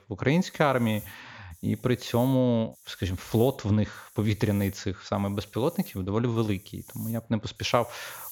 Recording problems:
high frequencies cut off; noticeable; nothing above 7.5 kHz
hiss; noticeable; throughout; 20 dB below the speech

